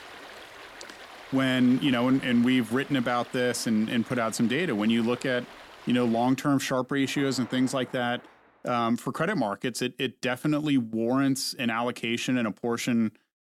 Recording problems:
rain or running water; noticeable; until 8.5 s; 20 dB below the speech

